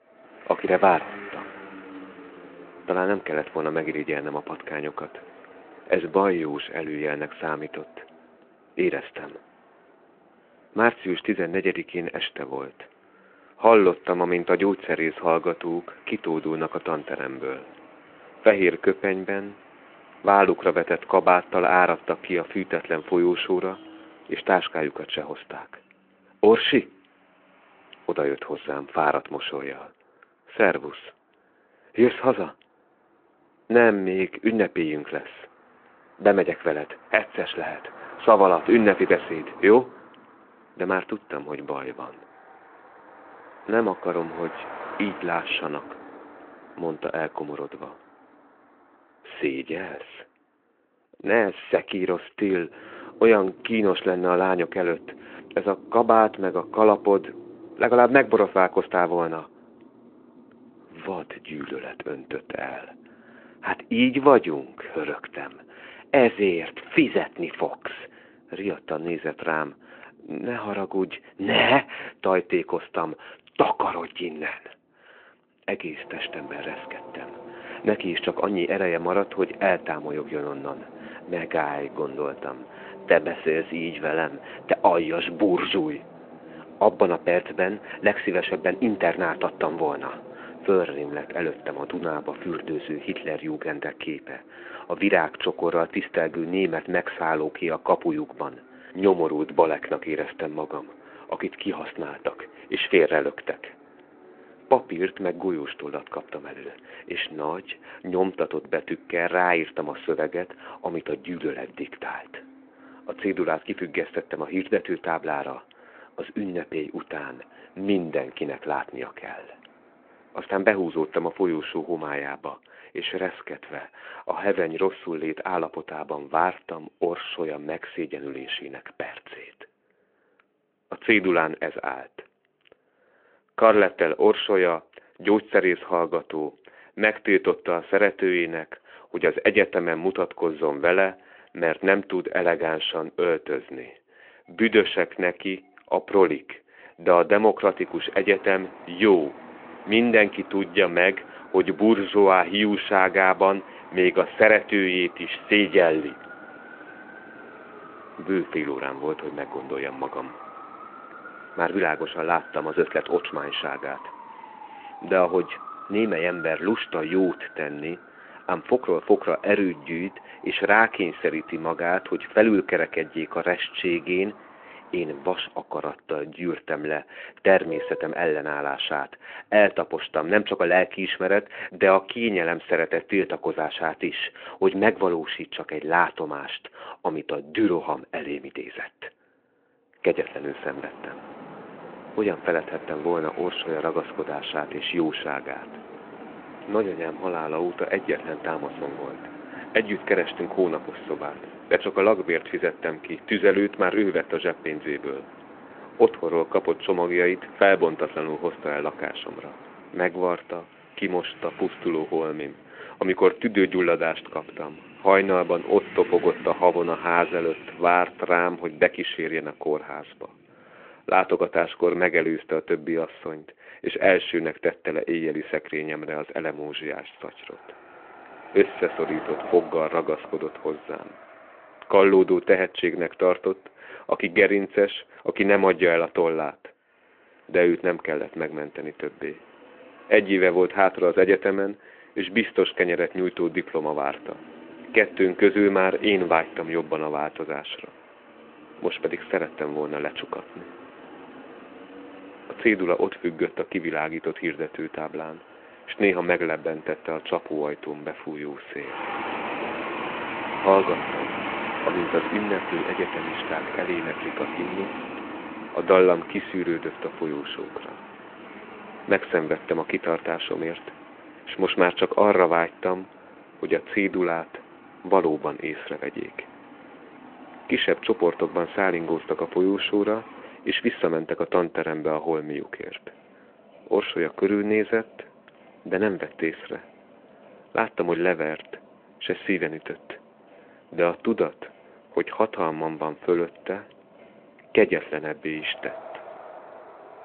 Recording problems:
phone-call audio
traffic noise; noticeable; throughout; 15 dB below the speech

